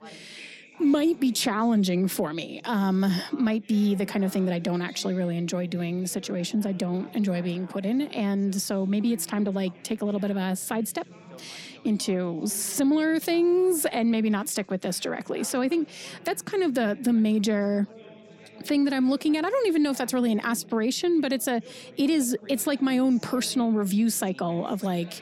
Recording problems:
background chatter; faint; throughout; 4 voices, 20 dB below the speech

